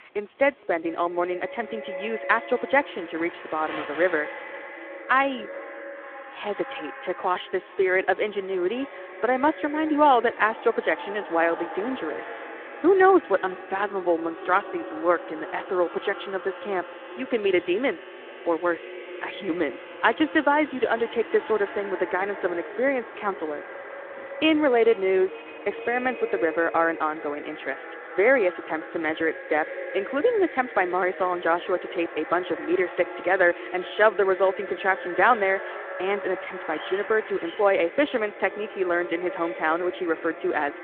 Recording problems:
echo of what is said; noticeable; throughout; 420 ms later, 15 dB below the speech
phone-call audio
household noises; faint; throughout; 20 dB below the speech
wind in the background; faint; throughout; 25 dB below the speech

